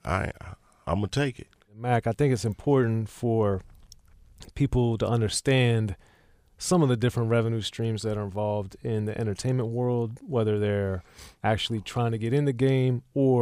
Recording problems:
abrupt cut into speech; at the end

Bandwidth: 15 kHz